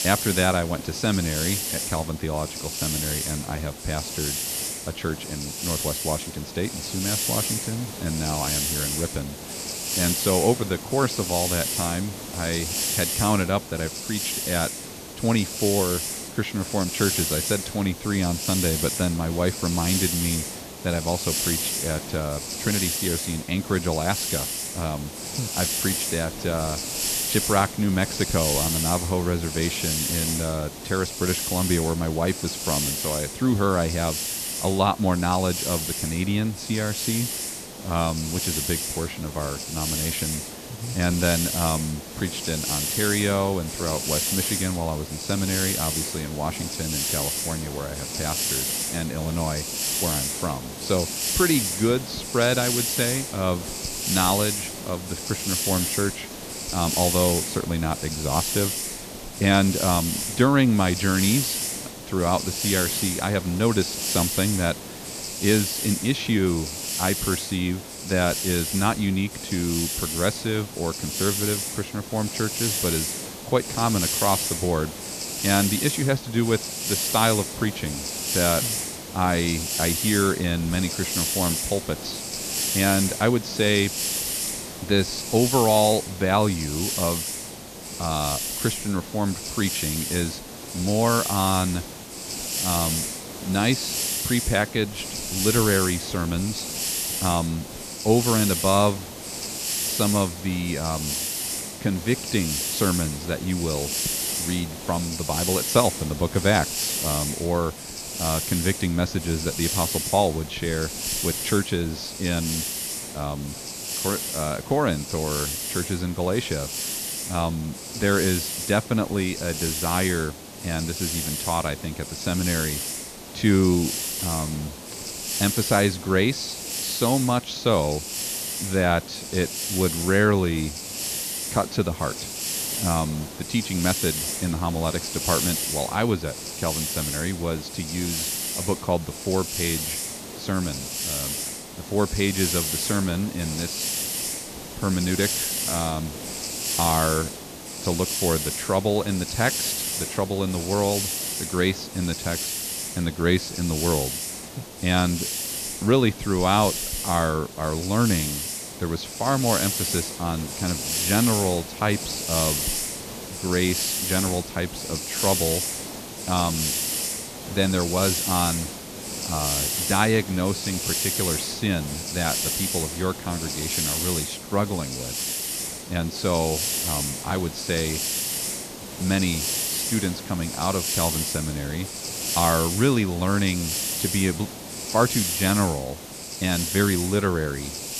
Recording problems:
high frequencies cut off; noticeable; nothing above 7 kHz
hiss; loud; throughout; 2 dB below the speech

